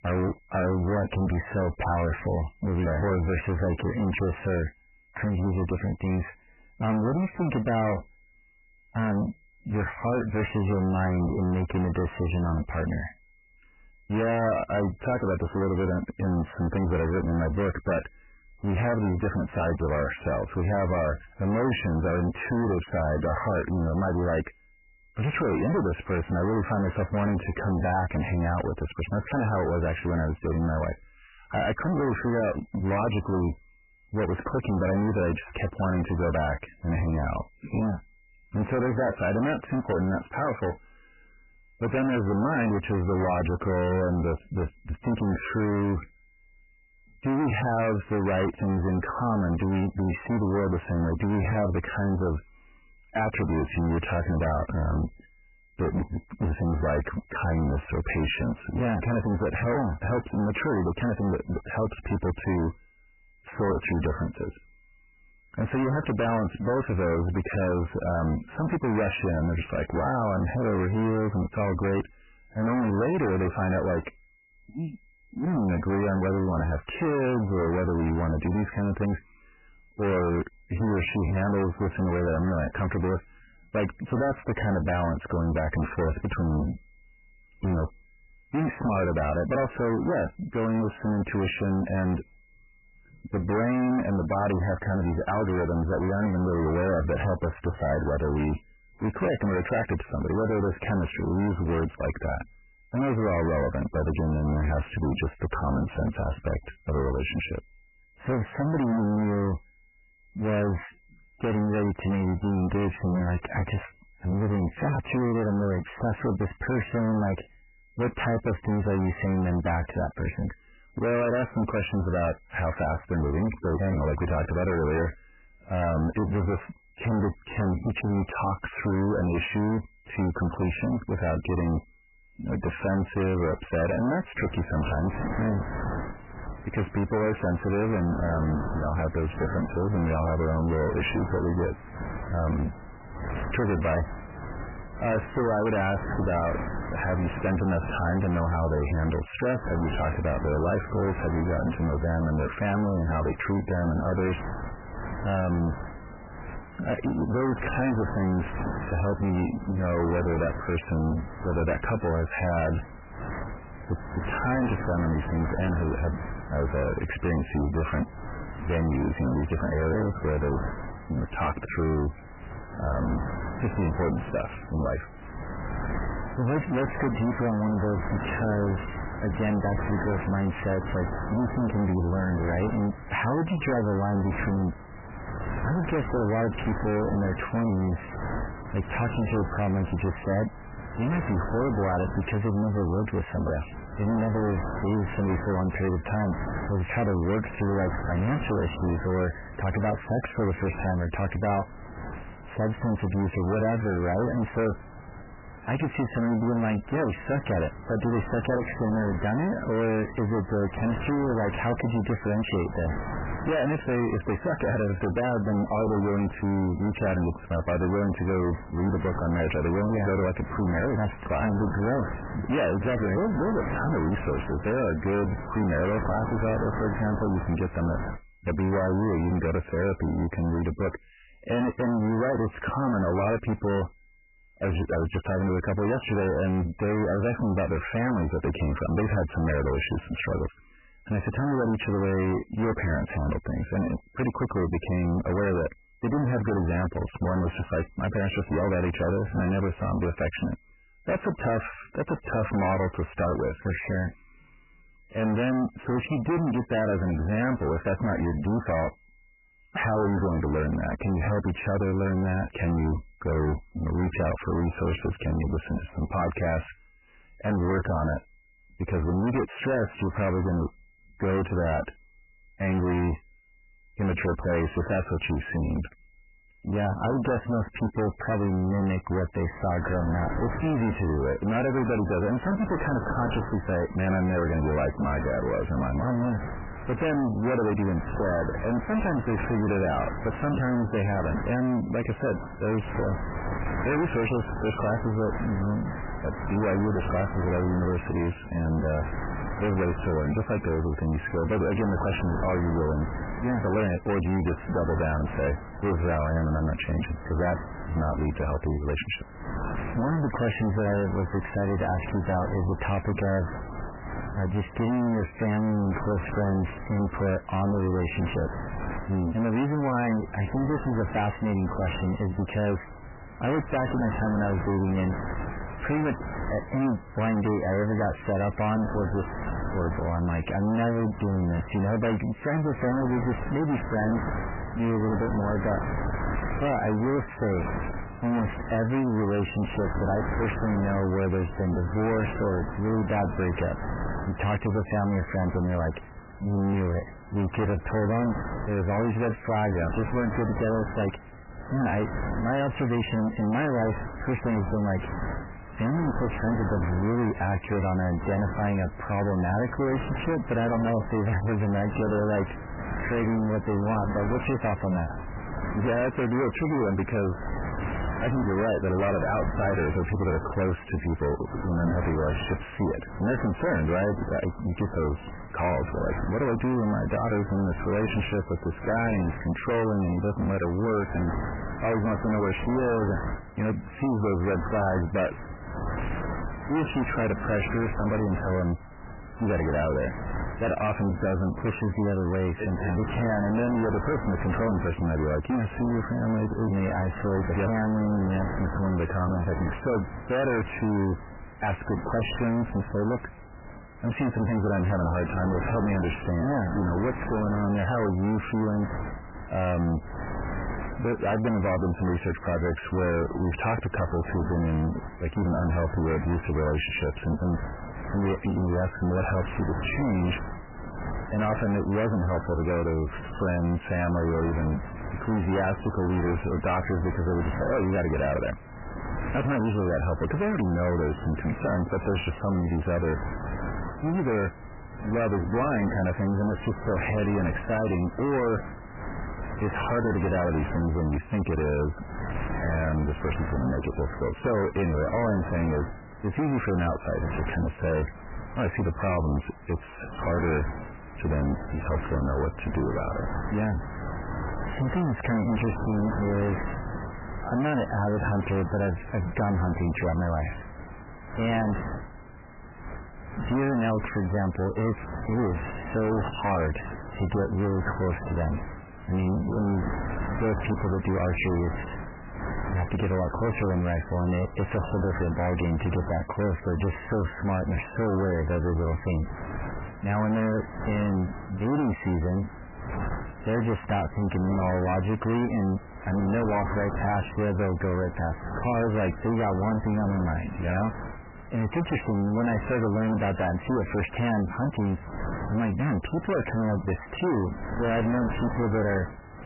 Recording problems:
distortion; heavy; 5 dB below the speech
garbled, watery; badly; nothing above 3 kHz
wind noise on the microphone; heavy; from 2:14 to 3:48 and from 4:40 on; 8 dB below the speech
high-pitched whine; faint; throughout; 2 kHz, 35 dB below the speech

